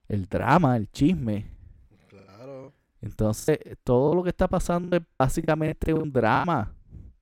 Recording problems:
choppy; very; 11% of the speech affected

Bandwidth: 16.5 kHz